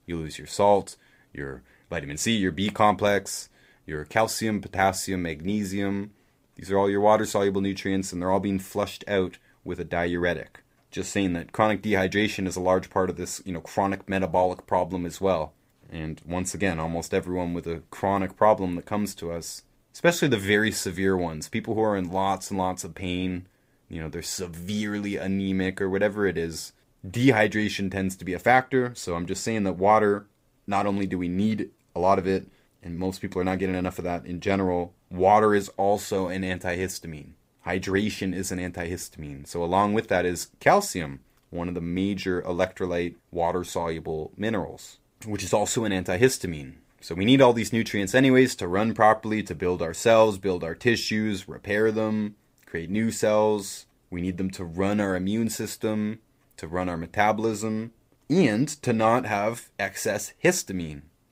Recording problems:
none

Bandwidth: 15.5 kHz